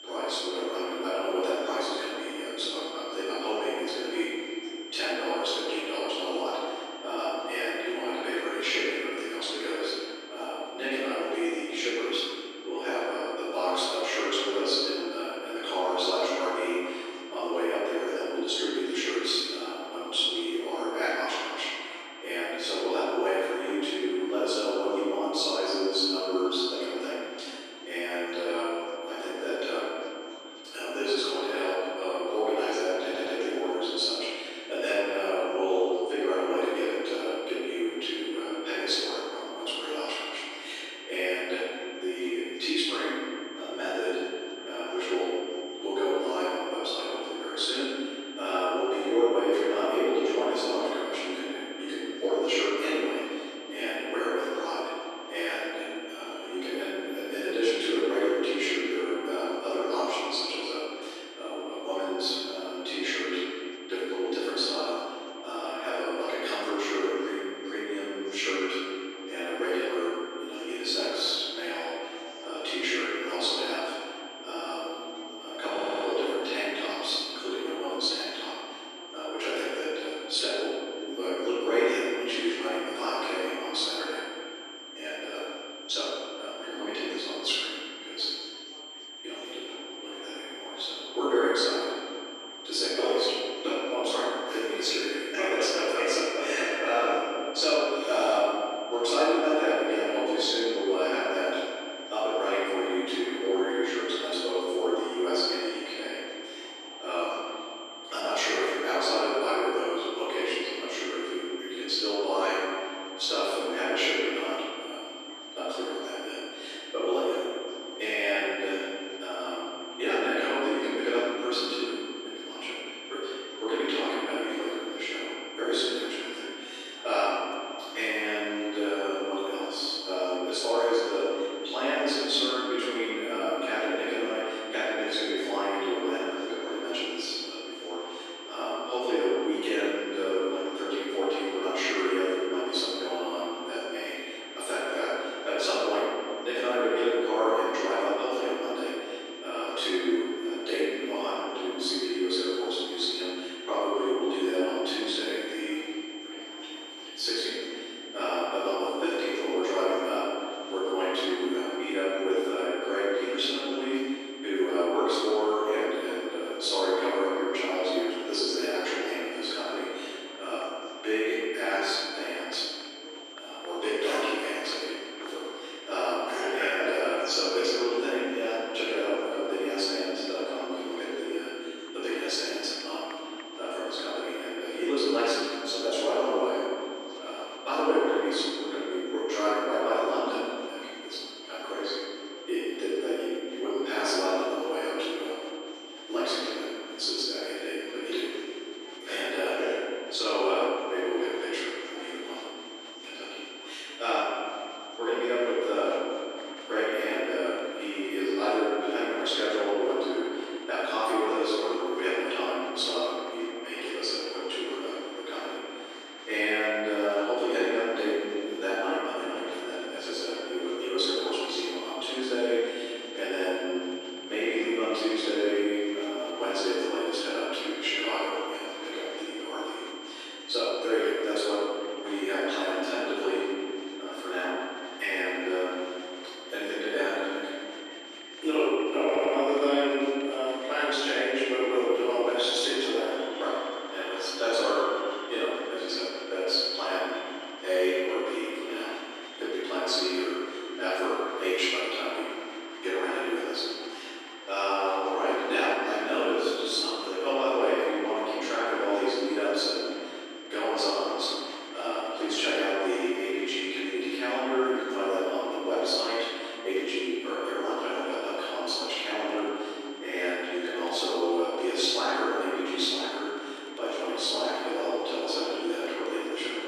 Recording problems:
room echo; strong; dies away in 2.5 s
off-mic speech; far
thin; very; fading below 300 Hz
high-pitched whine; noticeable; throughout; 3 kHz, 15 dB below the speech
murmuring crowd; noticeable; throughout; 20 dB below the speech
audio stuttering; at 33 s, at 1:16 and at 3:59

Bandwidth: 14.5 kHz